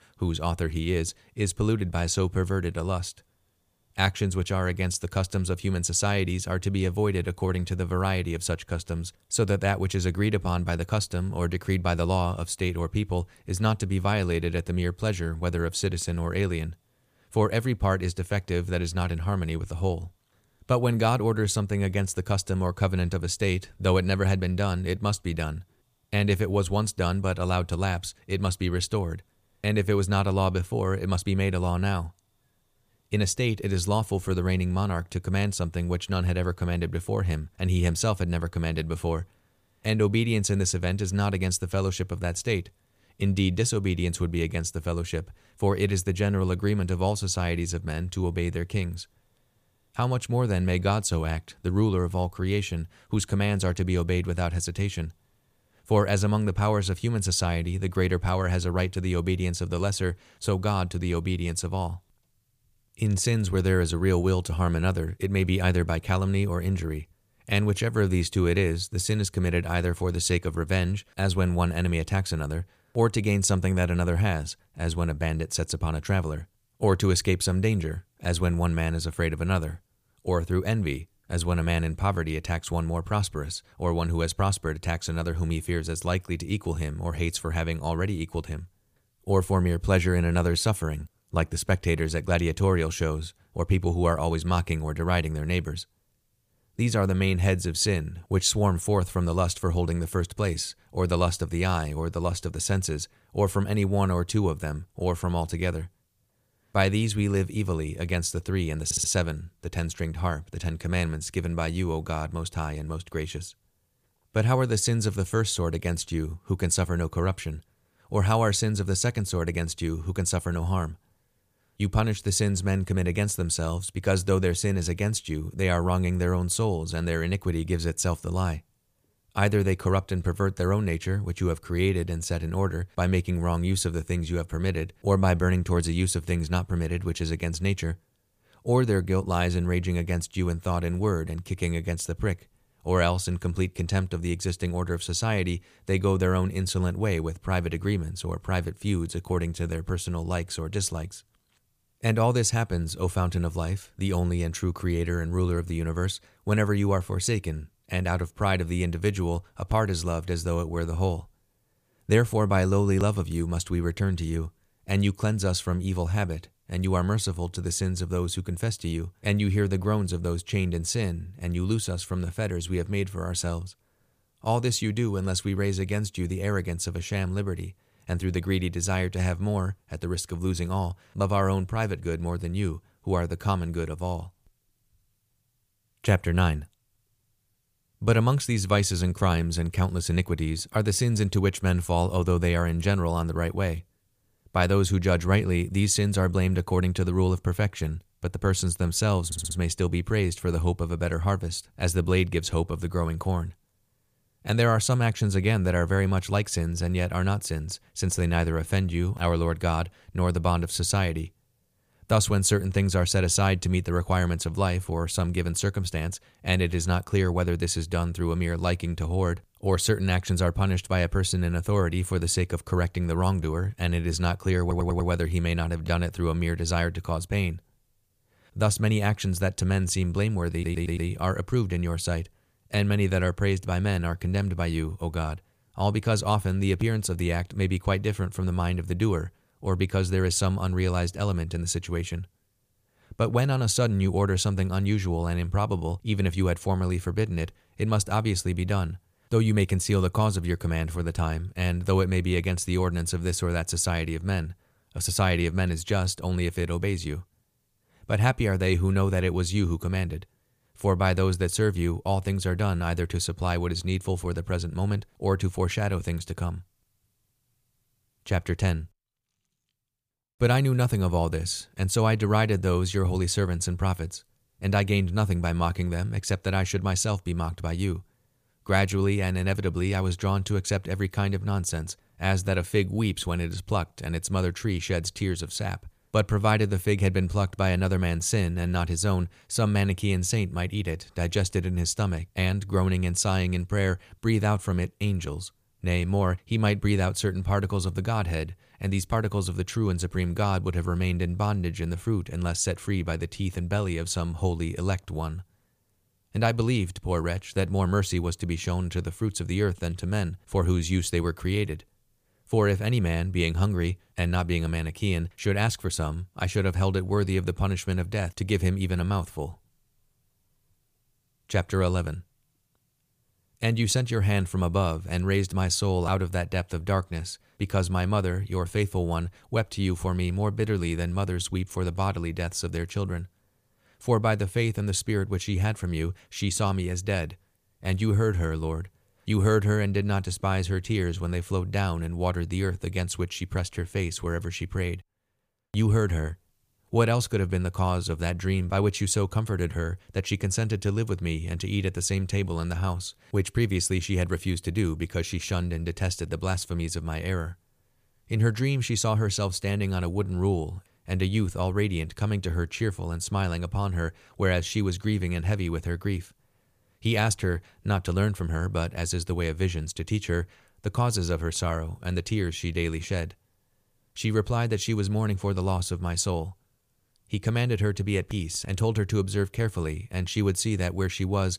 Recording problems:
audio stuttering; 4 times, first at 1:49

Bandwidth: 15 kHz